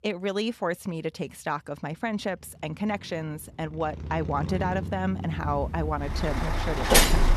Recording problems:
traffic noise; very loud; throughout; 3 dB above the speech

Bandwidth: 13.5 kHz